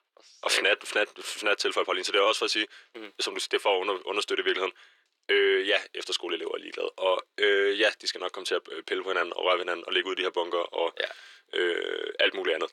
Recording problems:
thin; very; fading below 350 Hz

